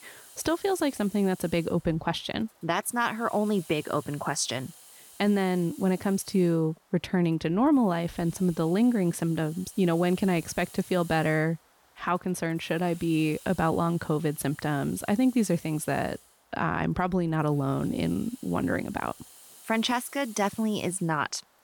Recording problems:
hiss; faint; throughout; 20 dB below the speech

